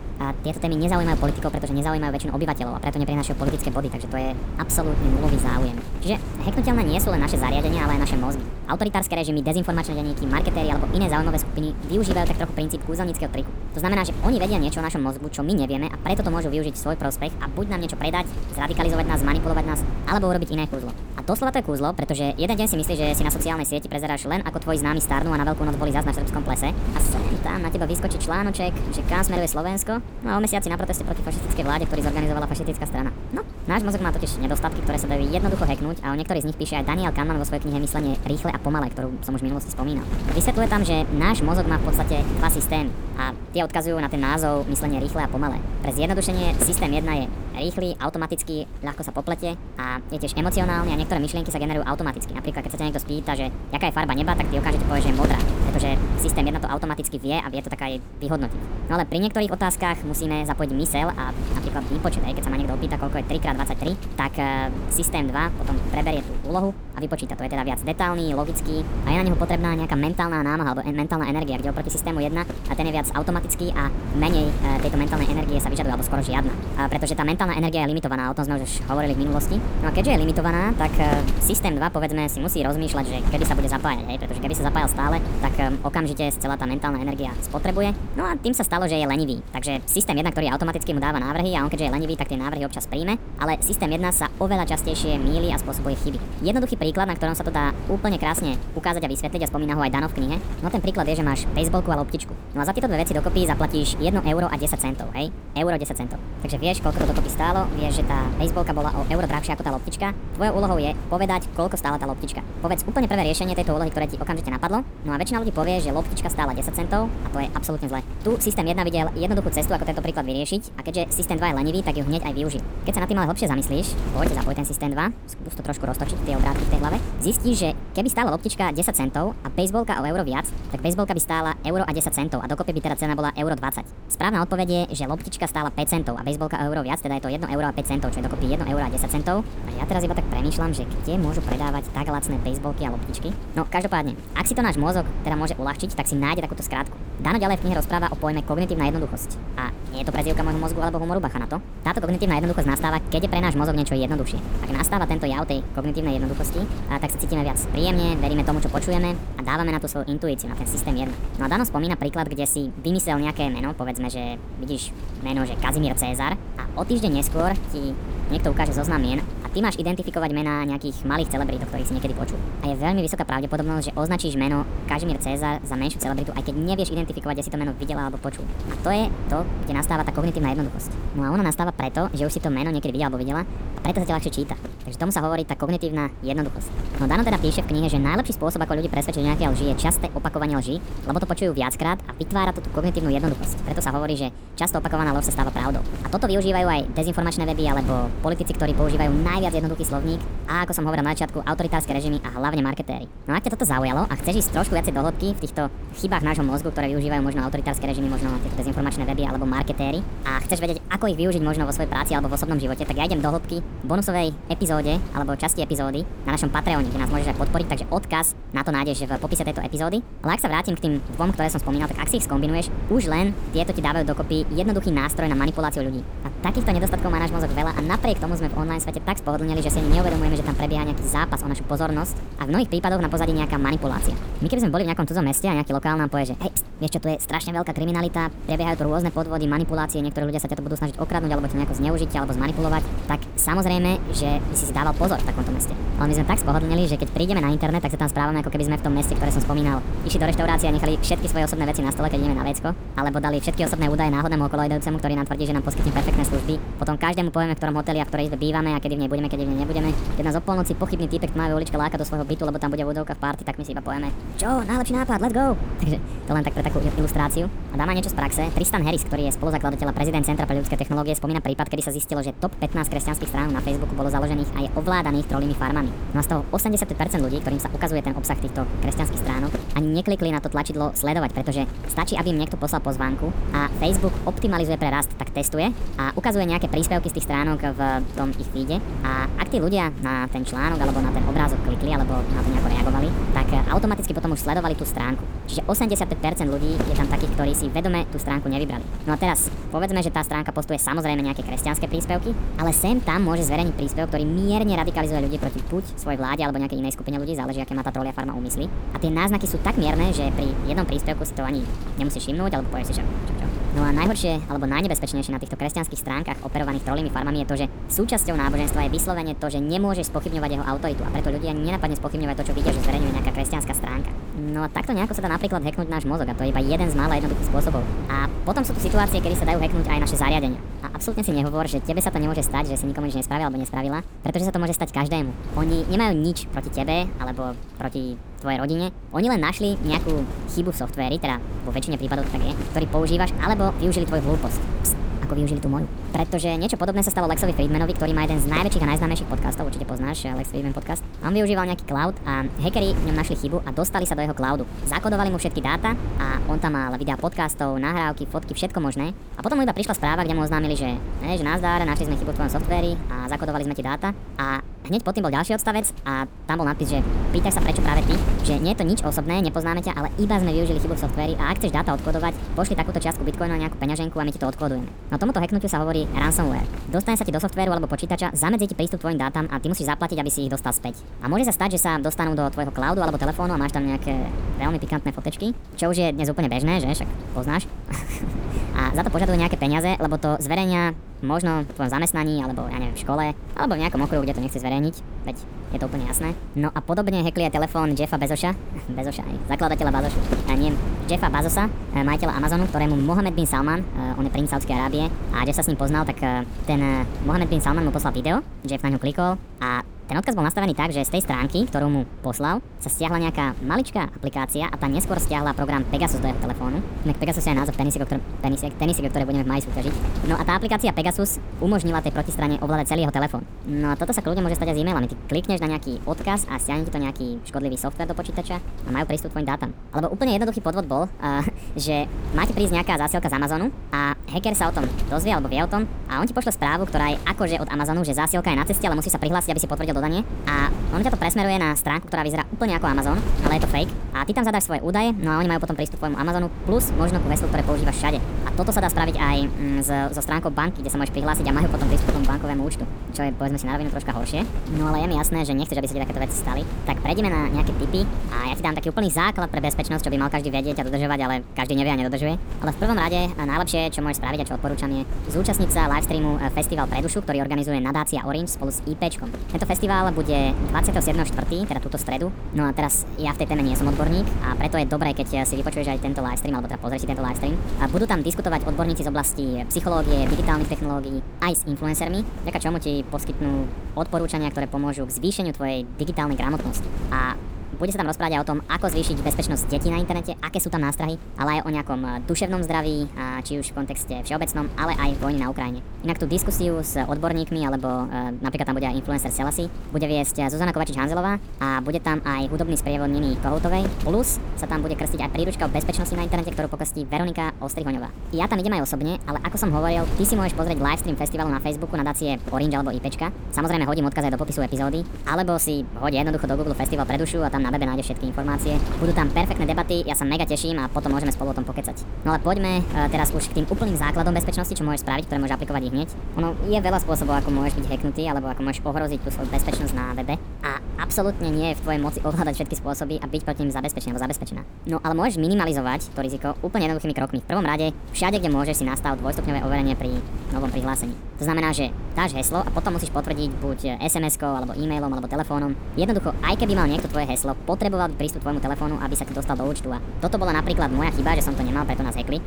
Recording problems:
wrong speed and pitch; too fast and too high; 1.5 times normal speed
wind noise on the microphone; occasional gusts; 10 dB below the speech

